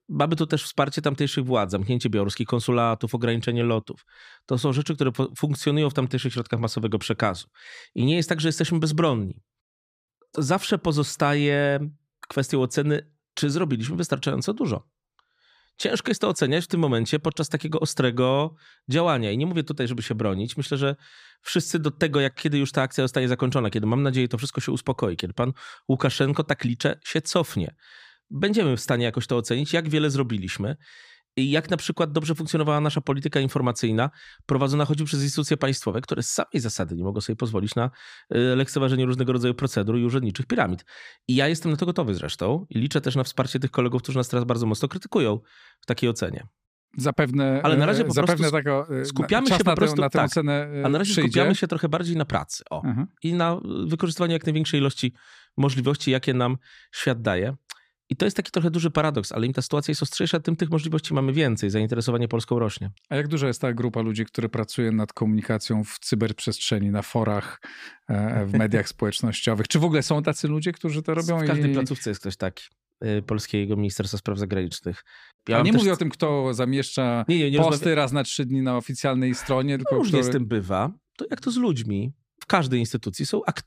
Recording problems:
none

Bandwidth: 15 kHz